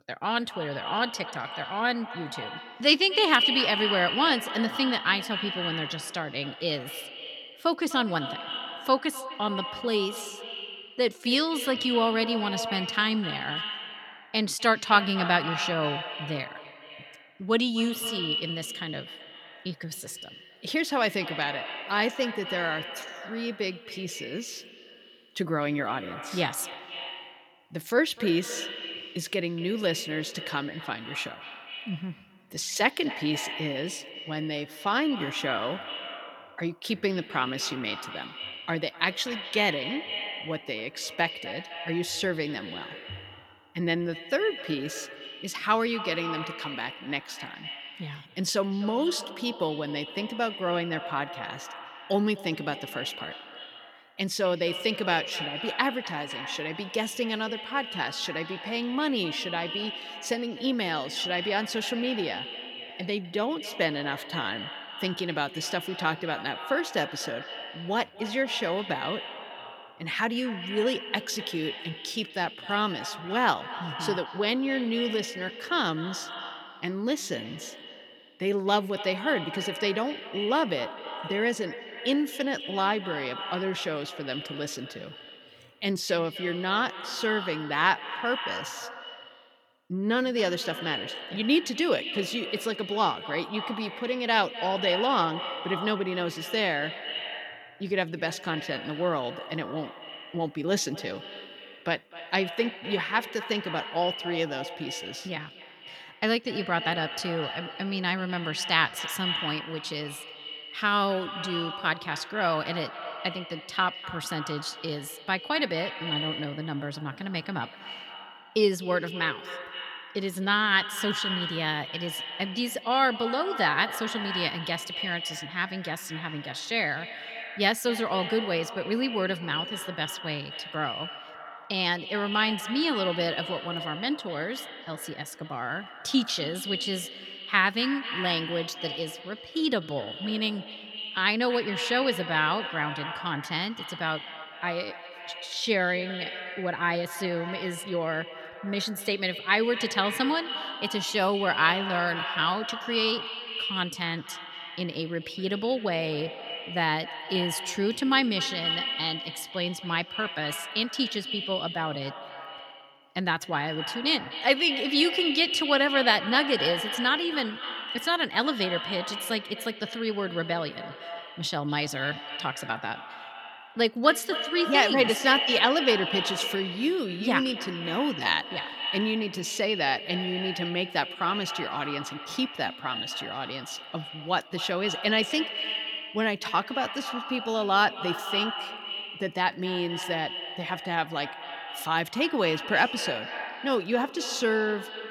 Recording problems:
echo of what is said; strong; throughout; 250 ms later, 7 dB below the speech

